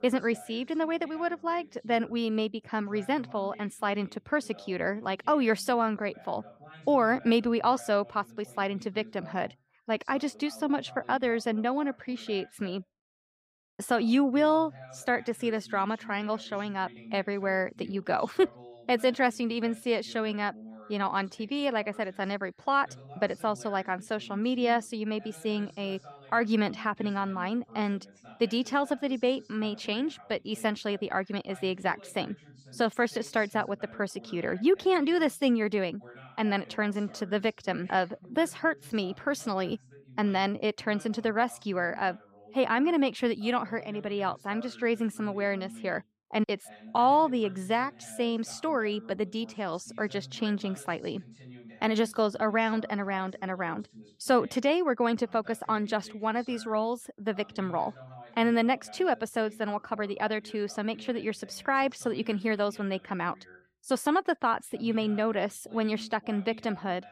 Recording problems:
voice in the background; faint; throughout; 20 dB below the speech

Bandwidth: 15.5 kHz